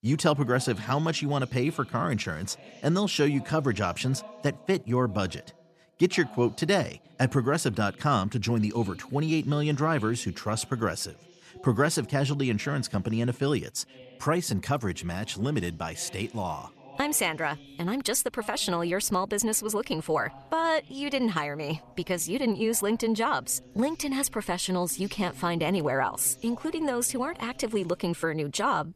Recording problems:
voice in the background; faint; throughout; 25 dB below the speech

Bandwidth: 13.5 kHz